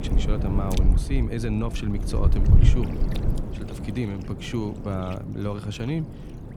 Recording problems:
wind noise on the microphone; heavy; 5 dB below the speech

